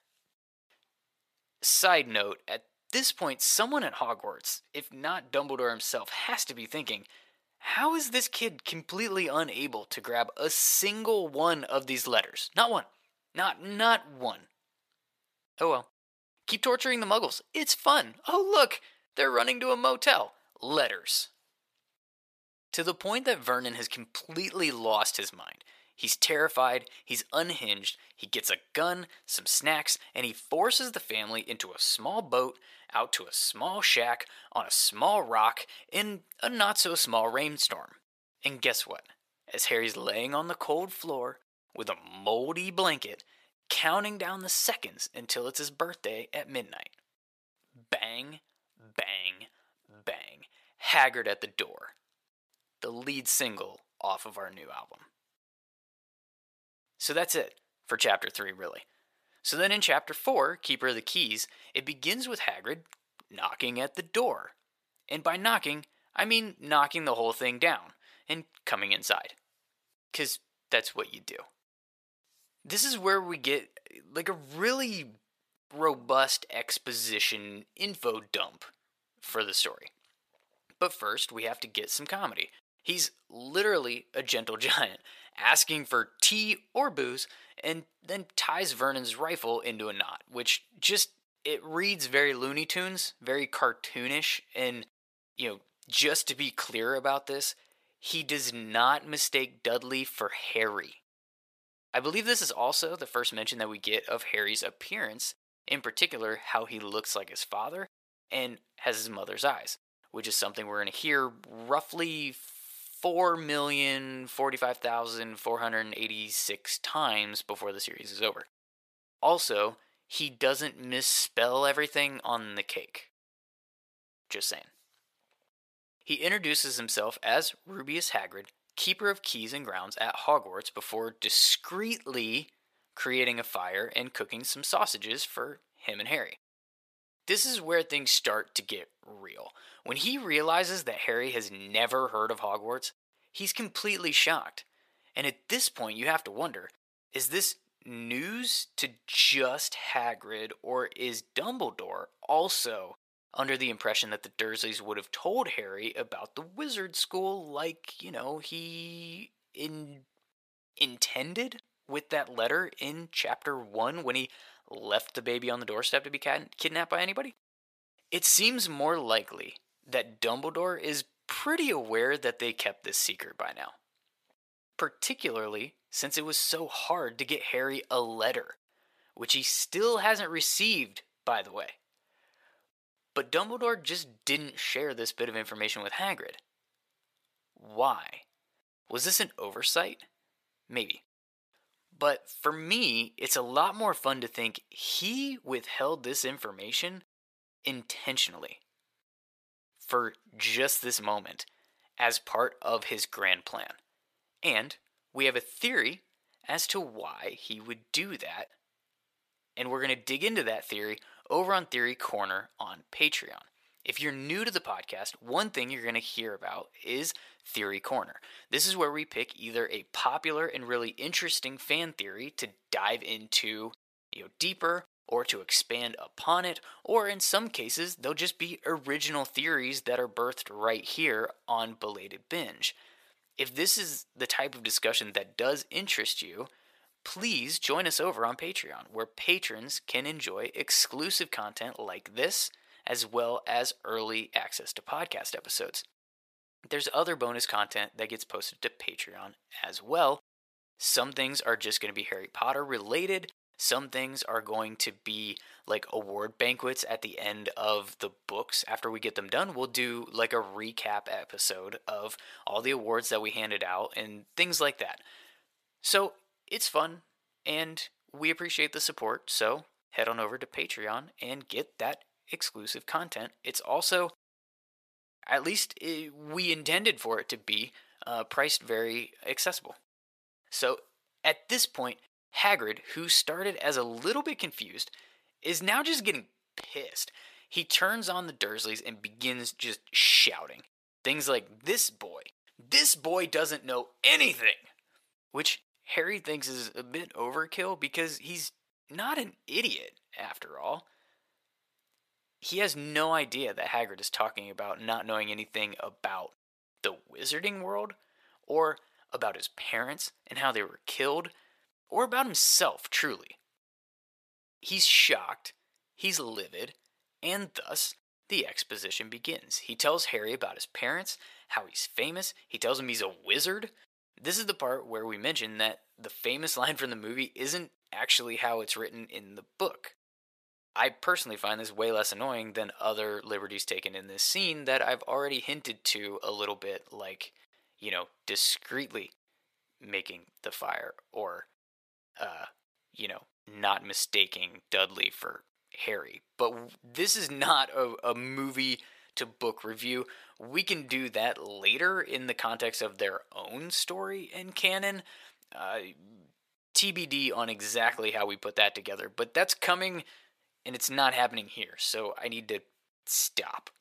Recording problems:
thin; very; fading below 600 Hz

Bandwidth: 14.5 kHz